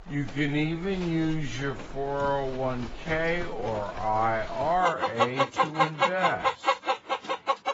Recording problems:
garbled, watery; badly; nothing above 7.5 kHz
wrong speed, natural pitch; too slow; 0.5 times normal speed
animal sounds; very loud; throughout; 2 dB above the speech

